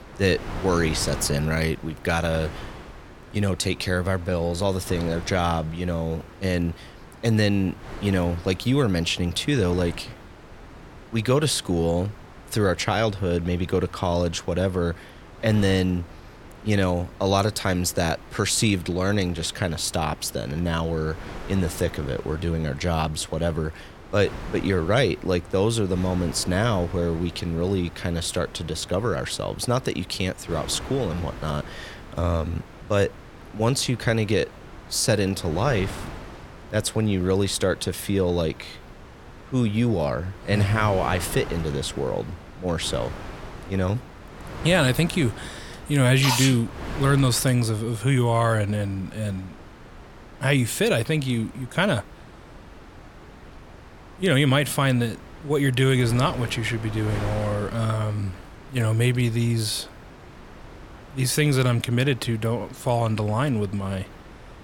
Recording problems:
wind noise on the microphone; occasional gusts; 15 dB below the speech

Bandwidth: 17 kHz